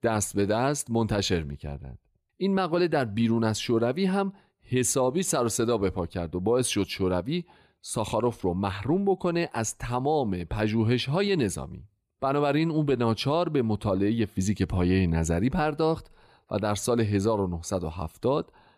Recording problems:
none

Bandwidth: 14.5 kHz